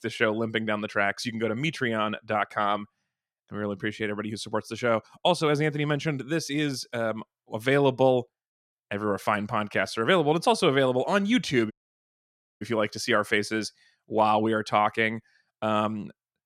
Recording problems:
audio cutting out; at 12 s for 1 s

